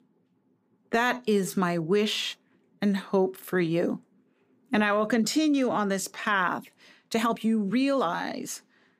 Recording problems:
uneven, jittery; strongly; from 1 to 8.5 s

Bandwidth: 15 kHz